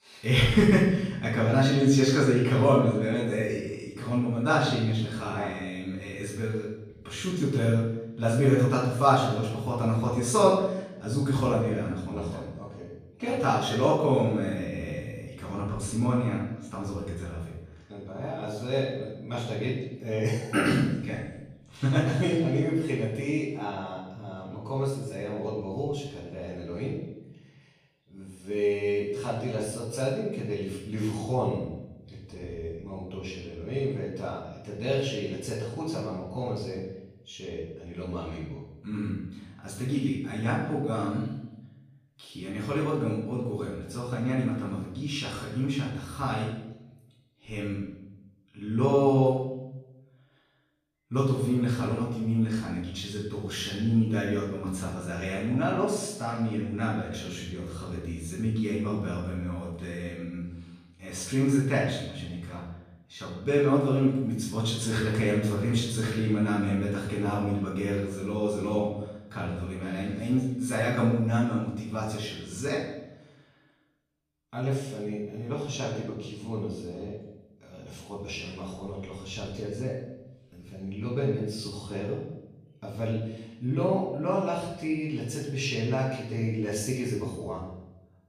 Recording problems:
off-mic speech; far
room echo; noticeable; dies away in 0.8 s

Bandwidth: 15 kHz